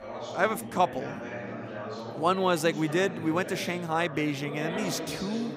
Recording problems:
chatter from many people; loud; throughout; 9 dB below the speech

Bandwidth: 15.5 kHz